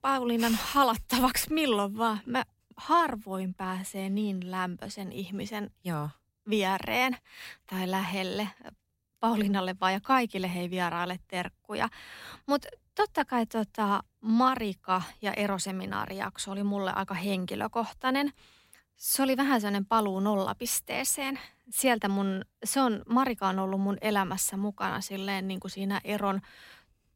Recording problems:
none

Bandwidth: 16 kHz